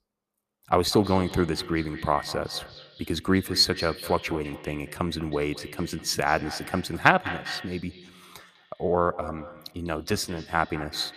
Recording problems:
echo of what is said; noticeable; throughout; 200 ms later, 15 dB below the speech

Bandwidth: 14.5 kHz